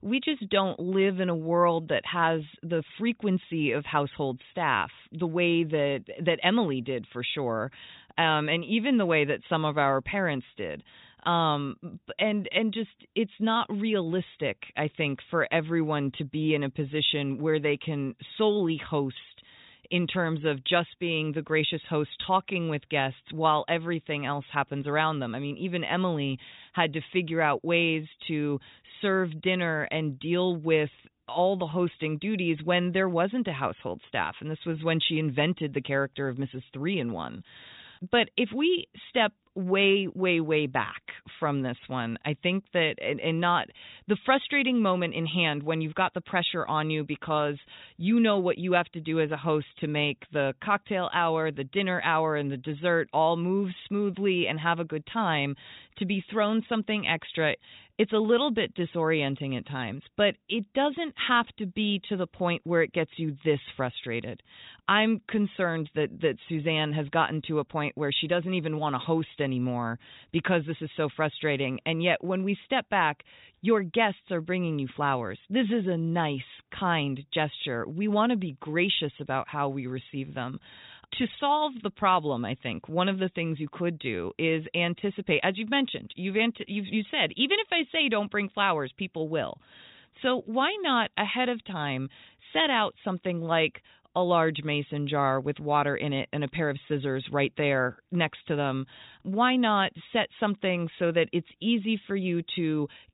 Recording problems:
high frequencies cut off; severe; nothing above 4 kHz

